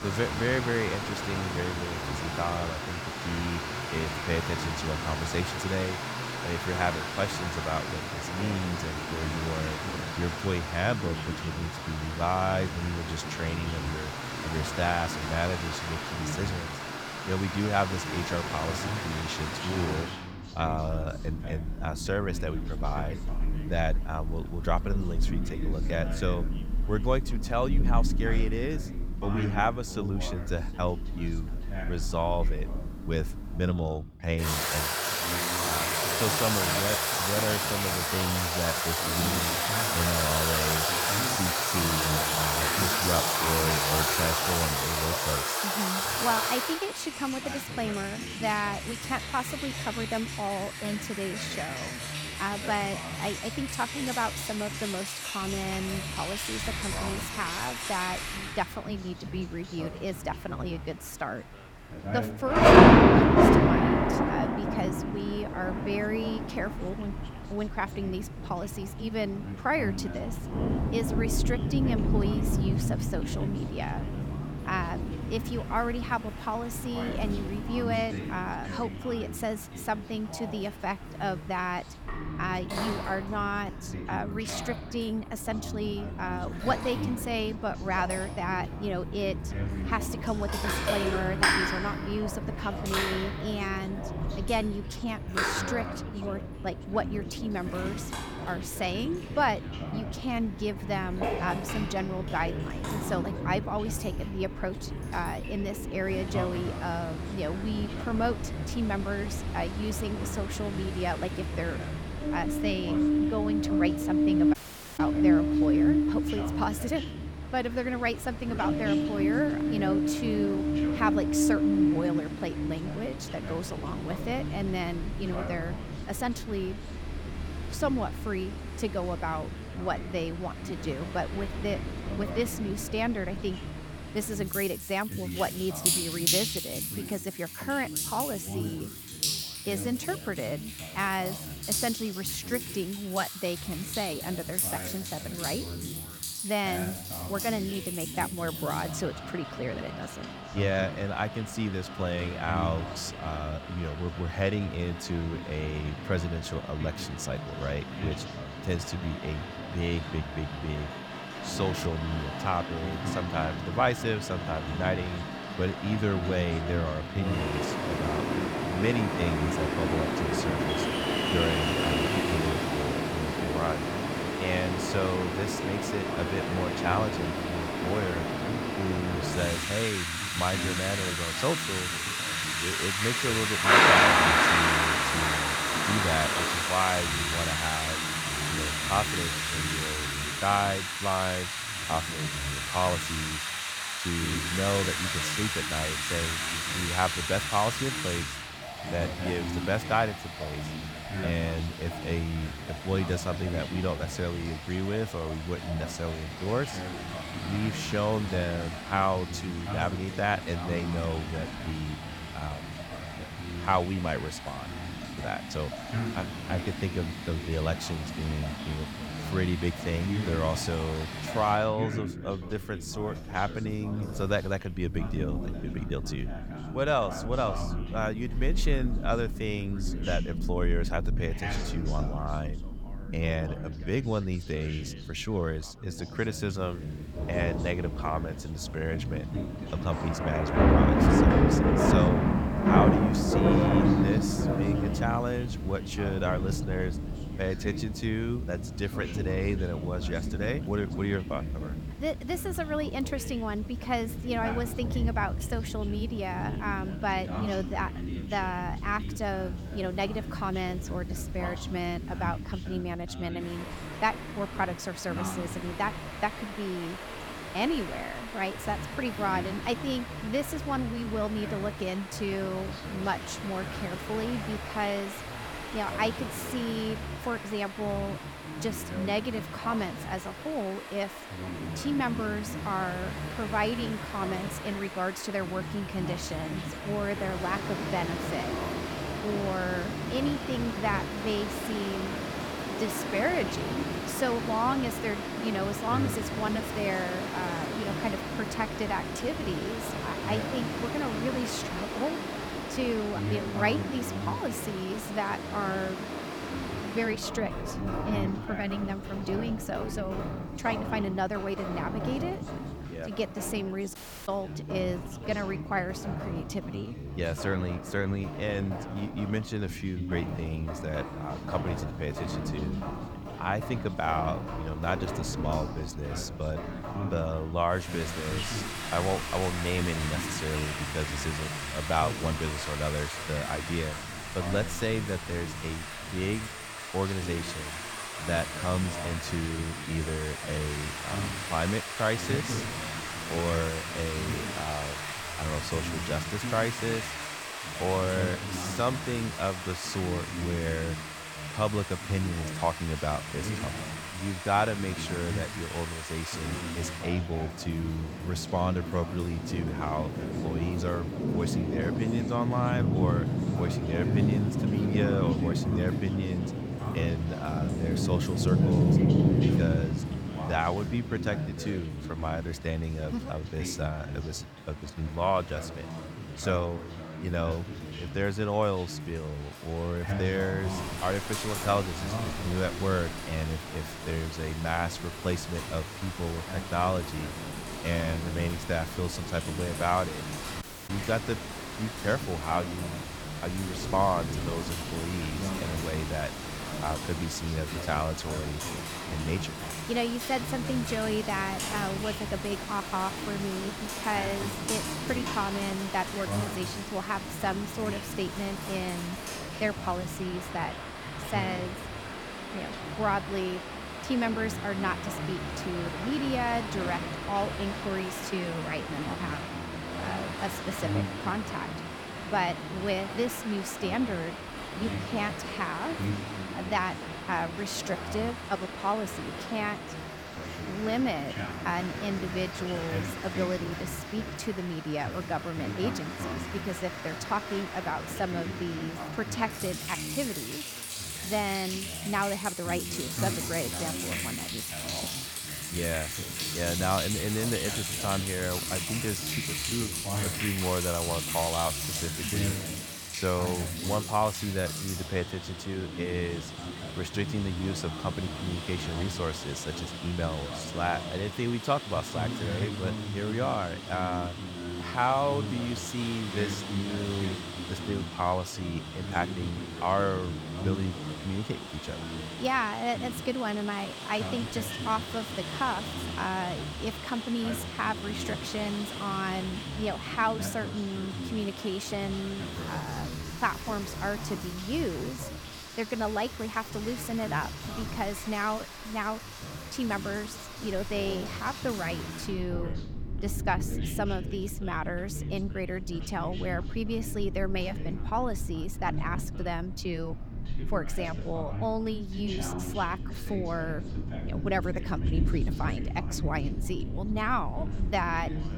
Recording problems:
rain or running water; very loud; throughout; as loud as the speech
background chatter; loud; throughout; 2 voices, 8 dB below the speech
audio cutting out; at 1:55, at 5:14 and at 6:31

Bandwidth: 19 kHz